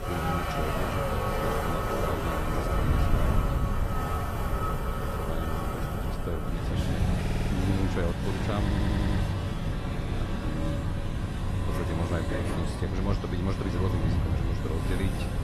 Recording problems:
garbled, watery; slightly; nothing above 13 kHz
traffic noise; very loud; throughout; 3 dB above the speech
wind noise on the microphone; heavy; 7 dB below the speech
audio stuttering; at 7 s and at 8.5 s

